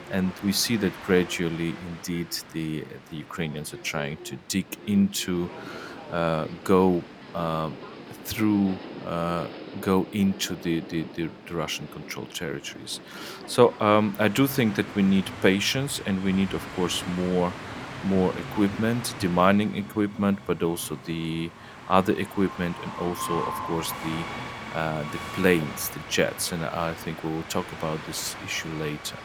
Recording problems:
train or aircraft noise; noticeable; throughout; 10 dB below the speech

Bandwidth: 18.5 kHz